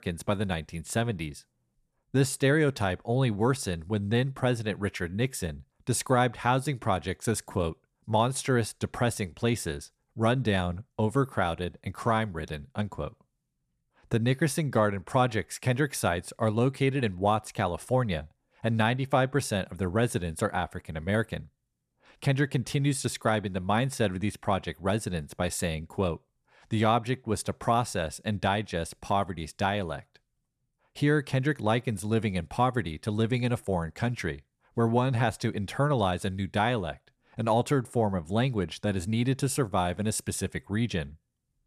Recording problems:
none

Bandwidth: 14 kHz